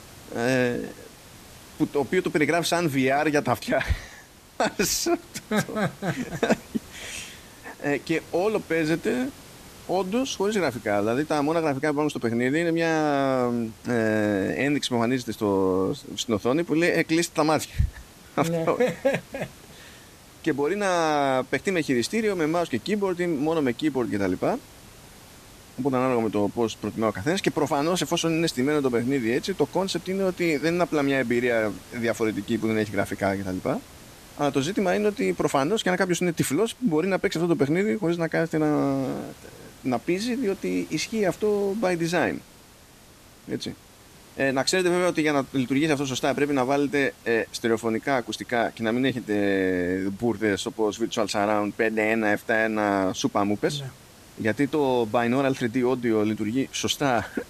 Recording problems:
hiss; faint; throughout; 20 dB below the speech

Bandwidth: 14.5 kHz